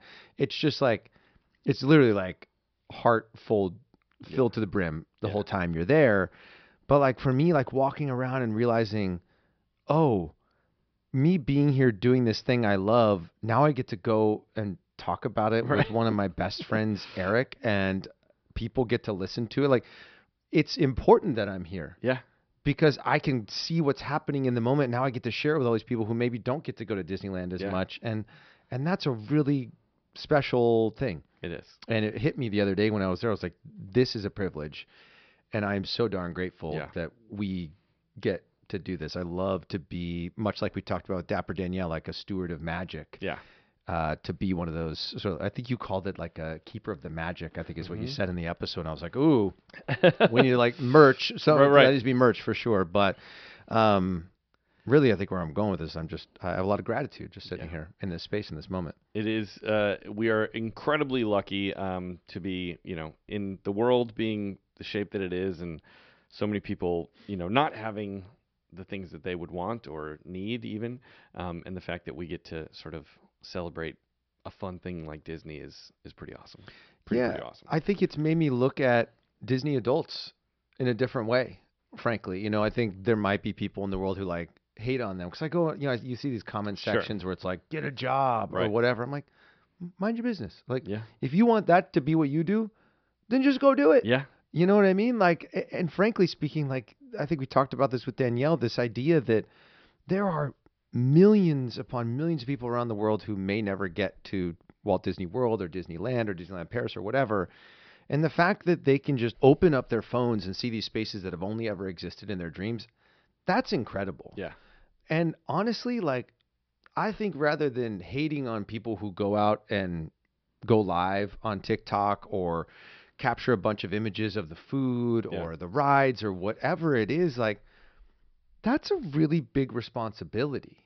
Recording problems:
high frequencies cut off; noticeable; nothing above 5.5 kHz

